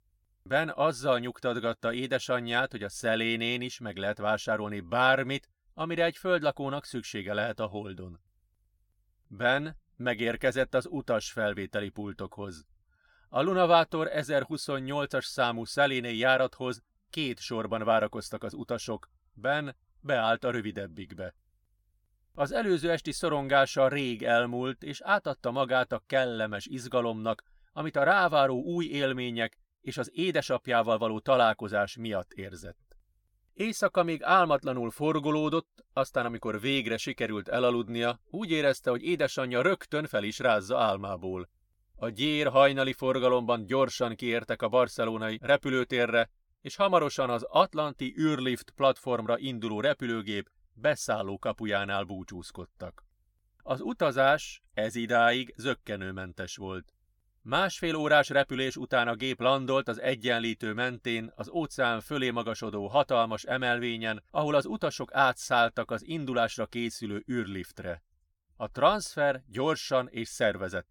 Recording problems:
none

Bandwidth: 19 kHz